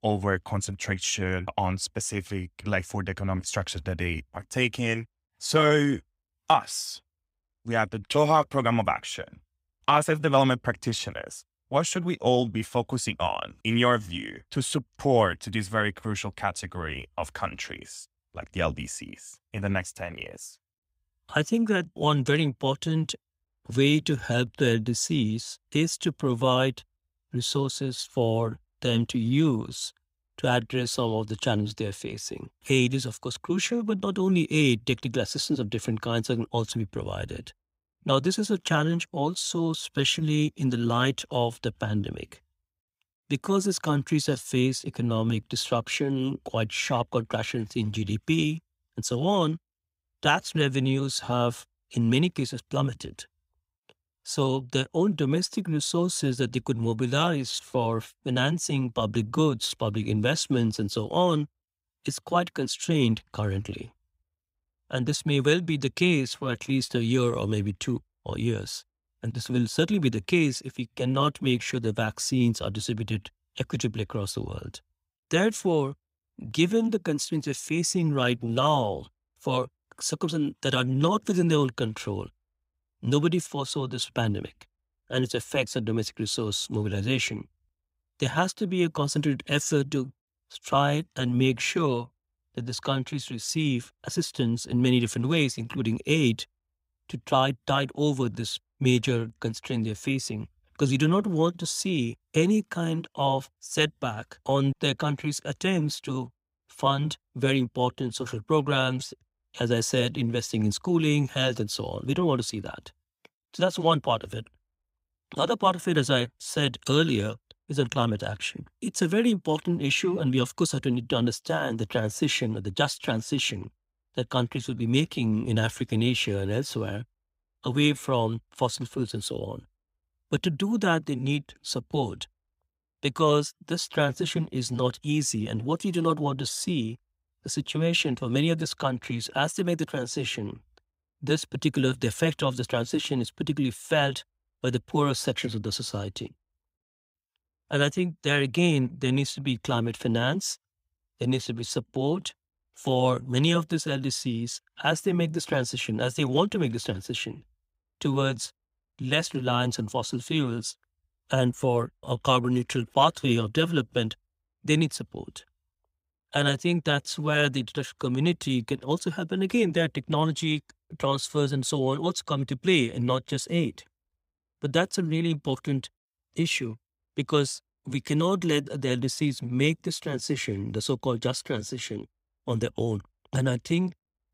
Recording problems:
none

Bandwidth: 15.5 kHz